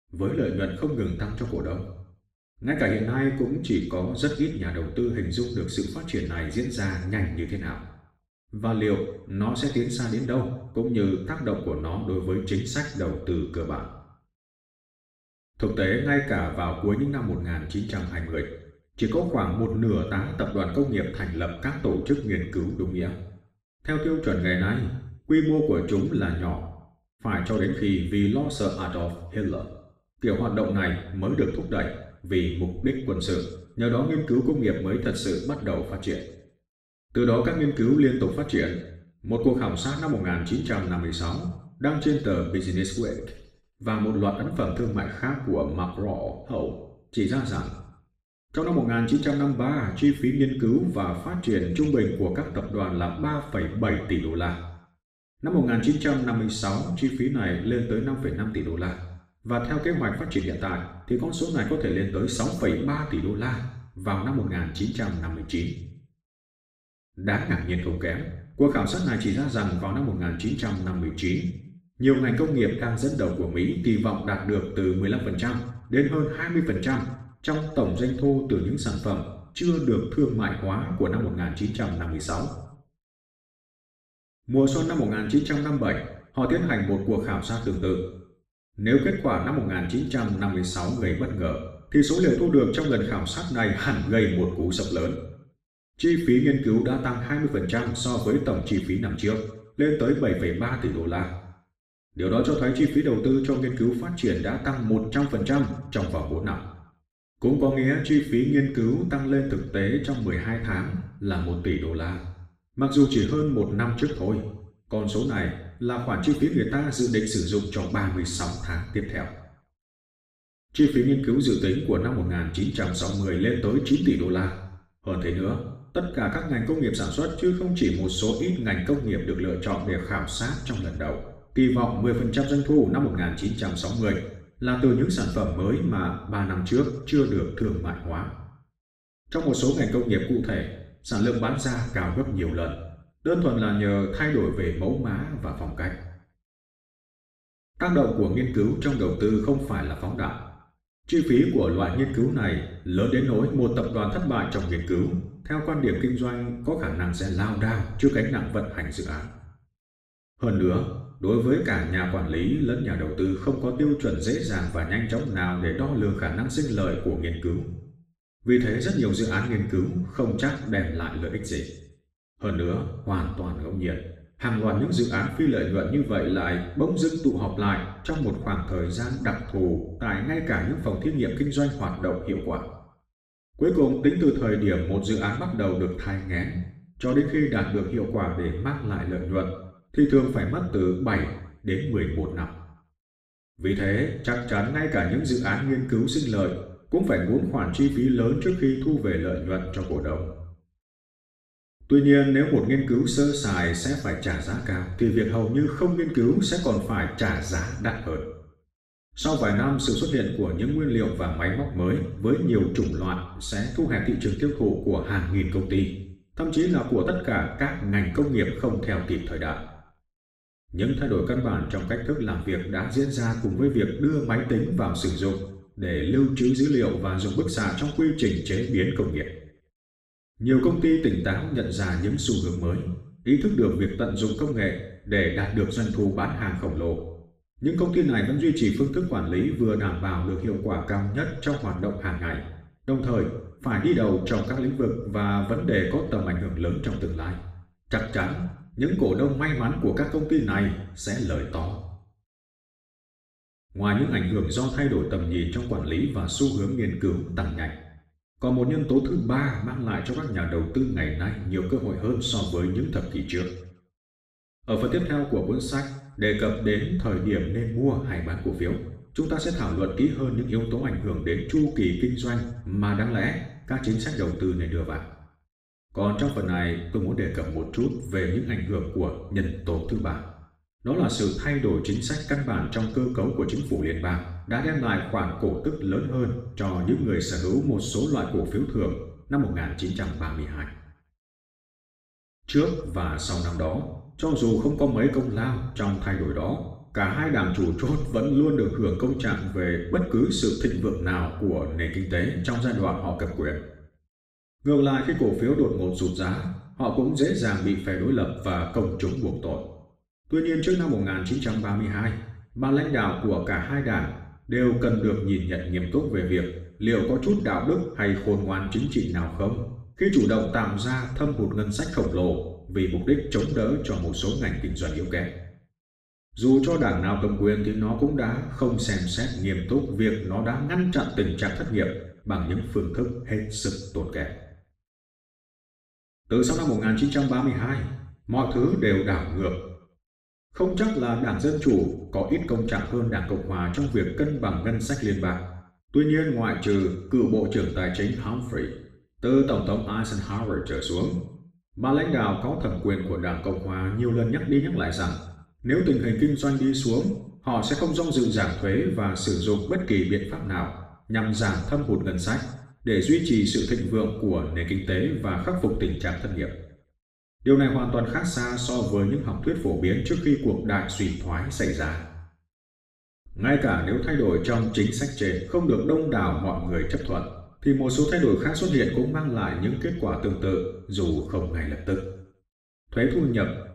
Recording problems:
off-mic speech; far
room echo; noticeable; dies away in 0.7 s

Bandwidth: 15 kHz